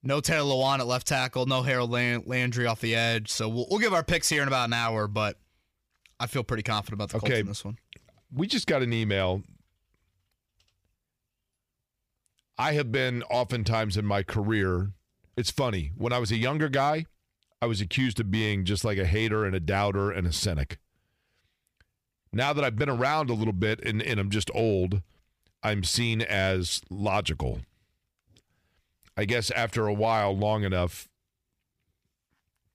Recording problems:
none

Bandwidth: 15 kHz